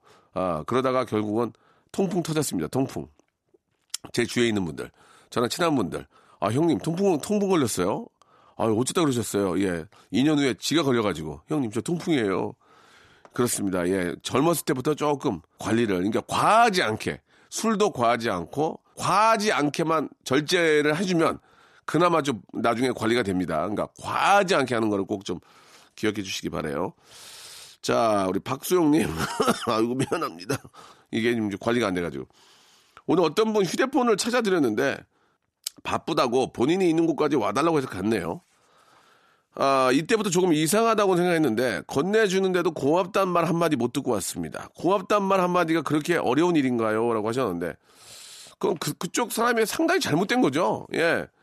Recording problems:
none

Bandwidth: 13.5 kHz